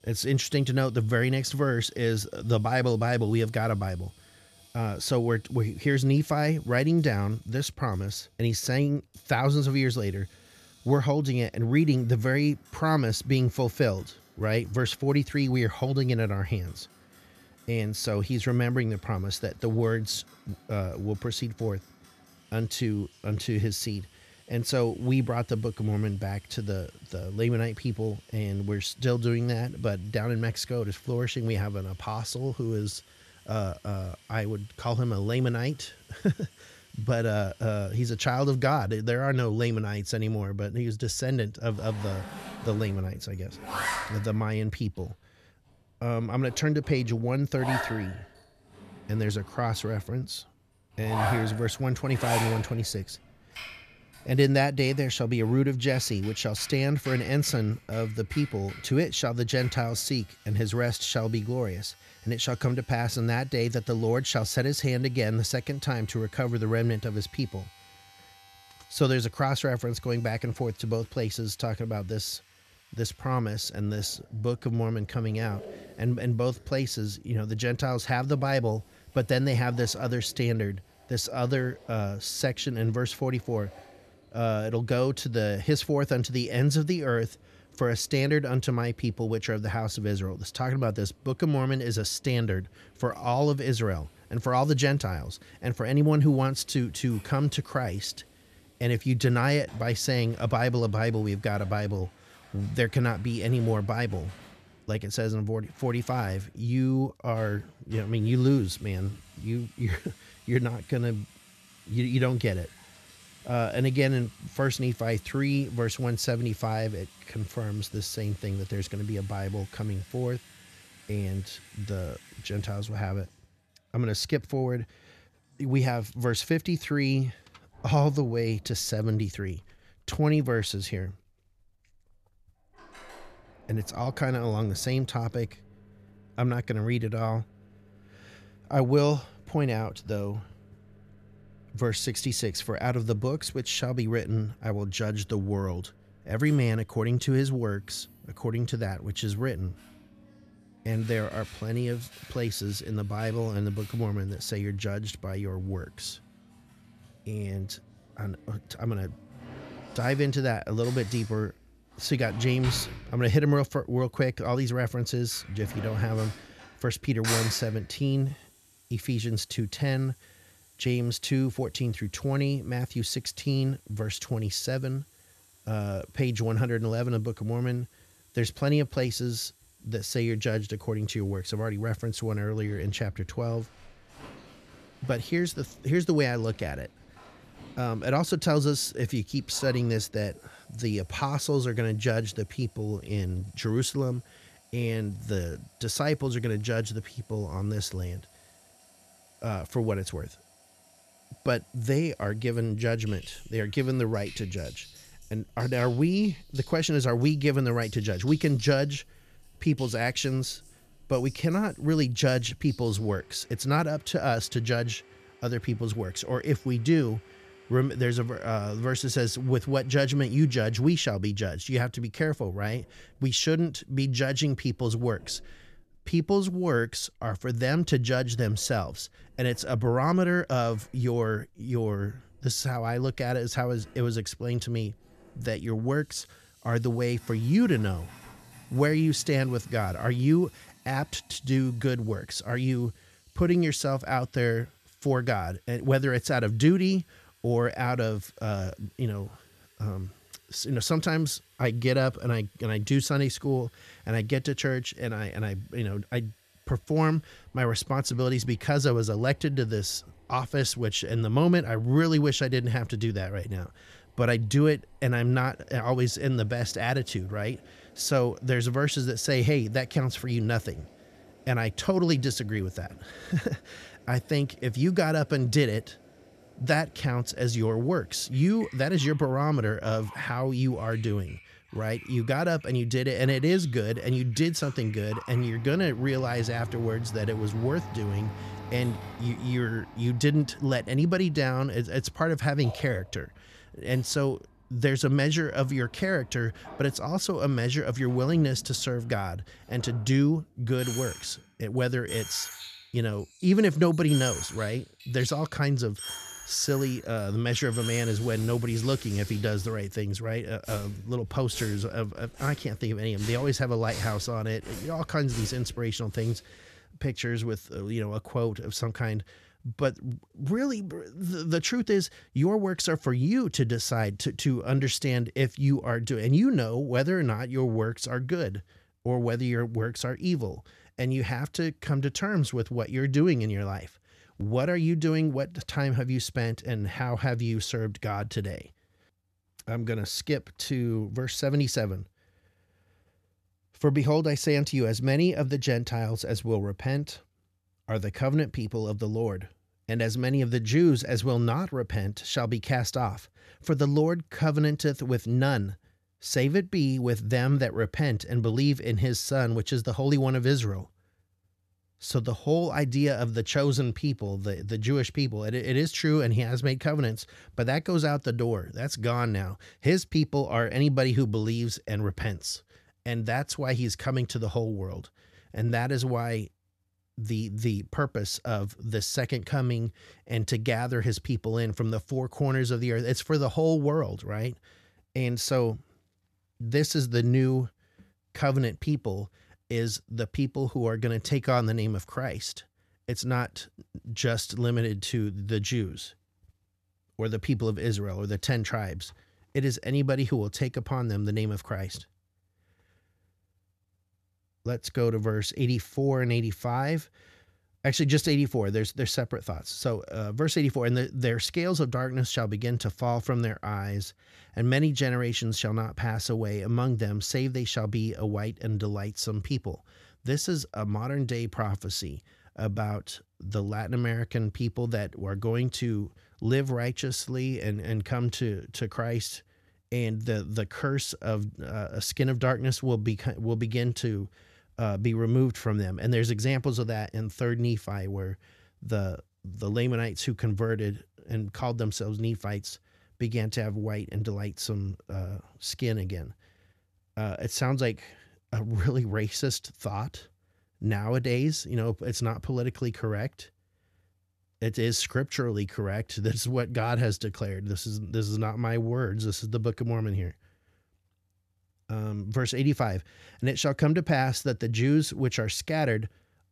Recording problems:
household noises; noticeable; until 5:16; 15 dB below the speech

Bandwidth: 14 kHz